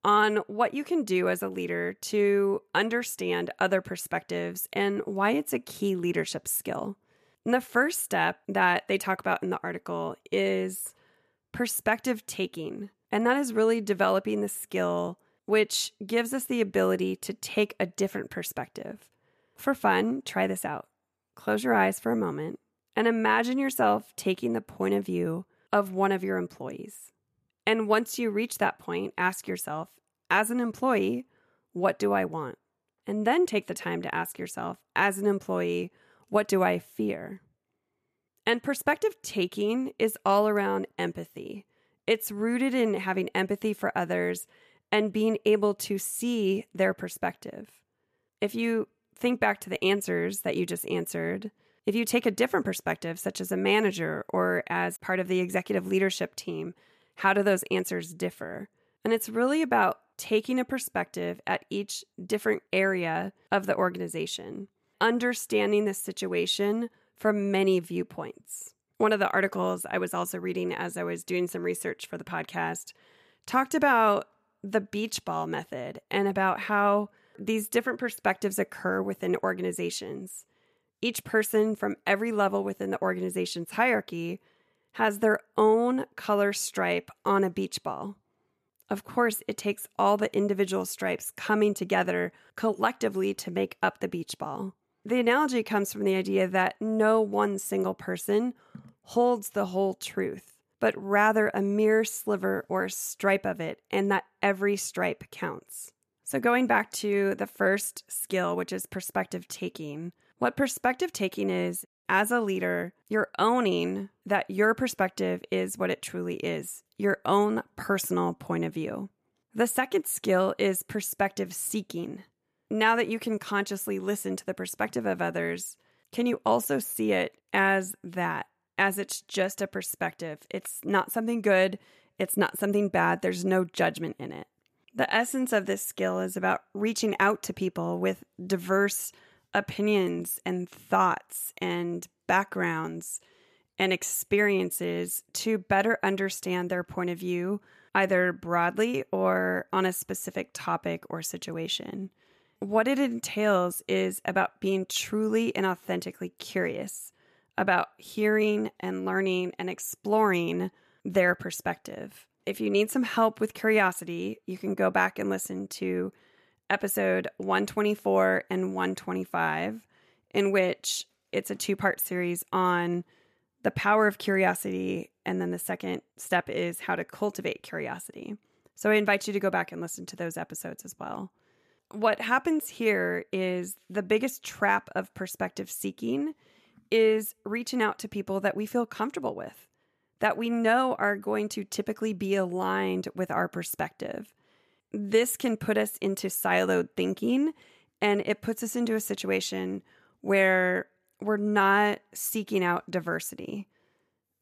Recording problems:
none

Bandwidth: 14.5 kHz